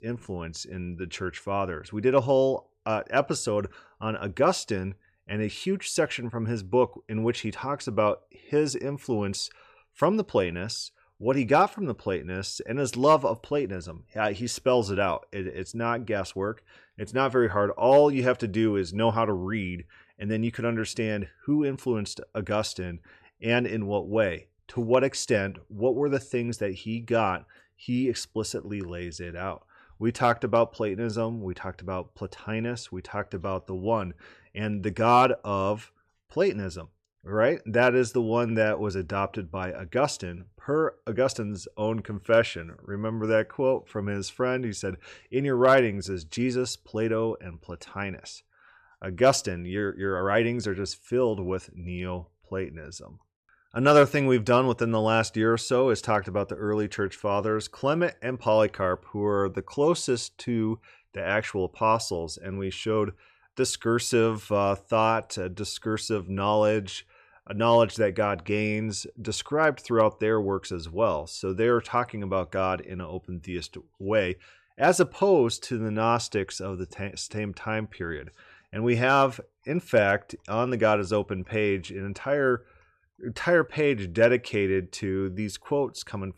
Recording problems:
none

